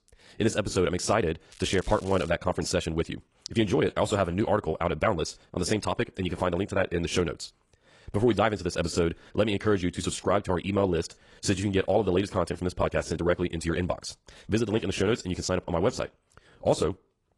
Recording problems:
wrong speed, natural pitch; too fast; 1.5 times normal speed
garbled, watery; slightly; nothing above 10.5 kHz
crackling; faint; at 1.5 s; 20 dB below the speech

